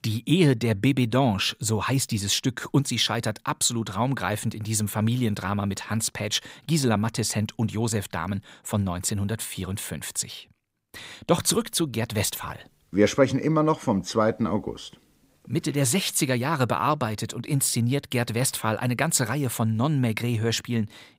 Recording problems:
none

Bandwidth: 15.5 kHz